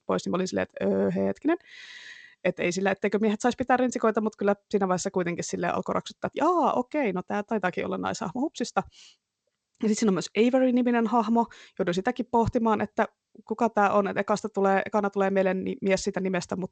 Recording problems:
garbled, watery; slightly; nothing above 8 kHz

